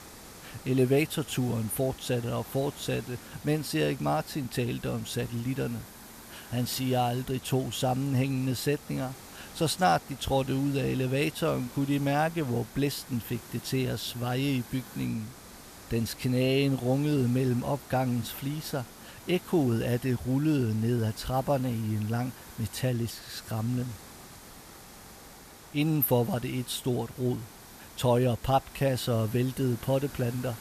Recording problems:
hiss; noticeable; throughout; 15 dB below the speech

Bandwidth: 14.5 kHz